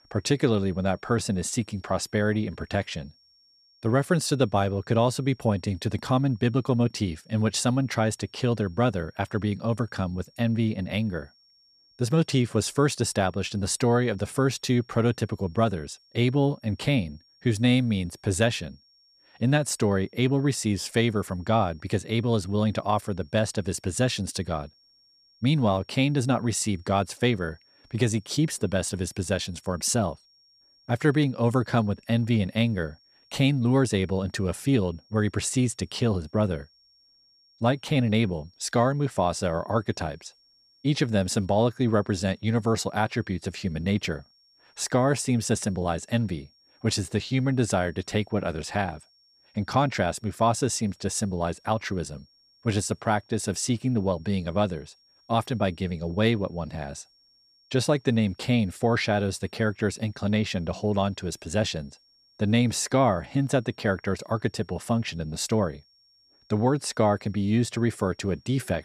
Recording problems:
high-pitched whine; faint; throughout; 5.5 kHz, 35 dB below the speech

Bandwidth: 14.5 kHz